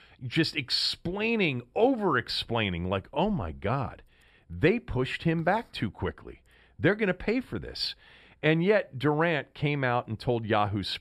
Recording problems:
none

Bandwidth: 14.5 kHz